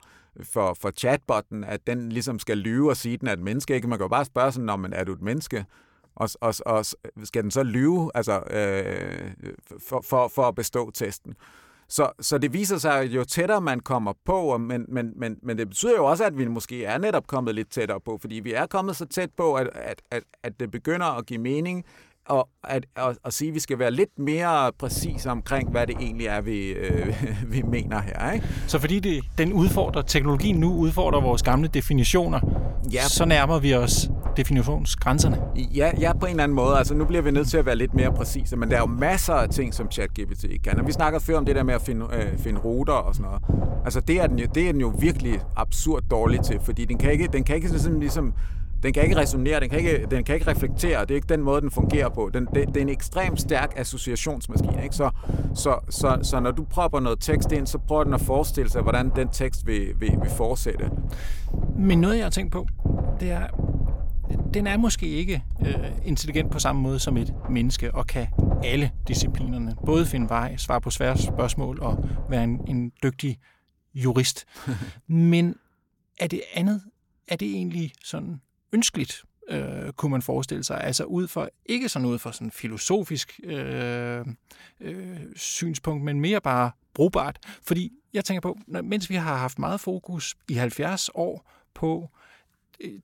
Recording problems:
low rumble; noticeable; from 25 s to 1:13; 10 dB below the speech

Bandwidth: 17 kHz